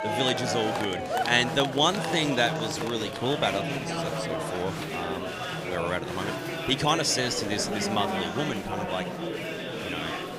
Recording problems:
murmuring crowd; loud; throughout; 3 dB below the speech

